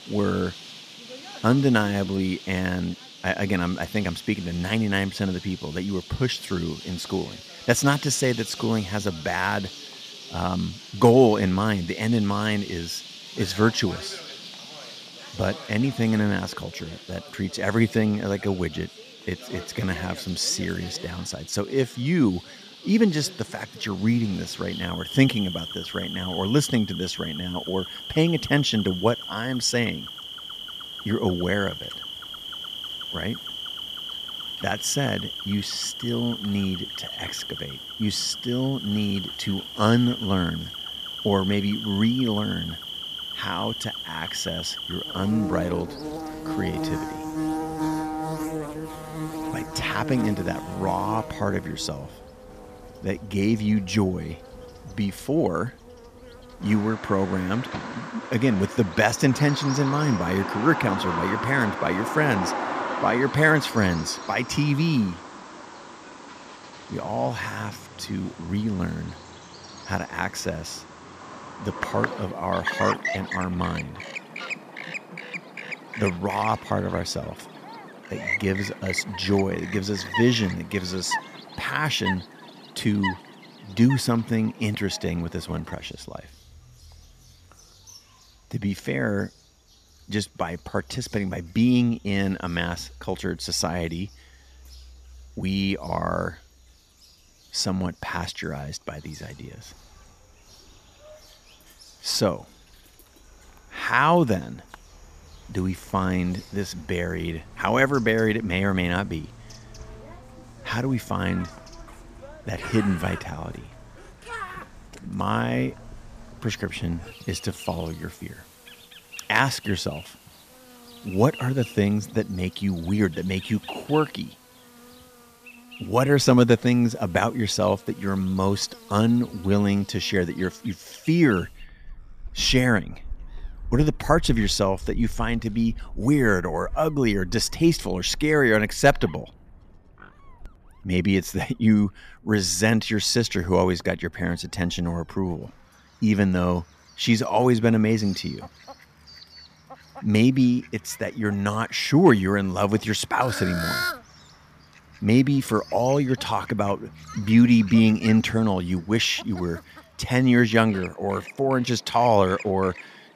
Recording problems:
animal sounds; noticeable; throughout; 10 dB below the speech

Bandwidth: 14.5 kHz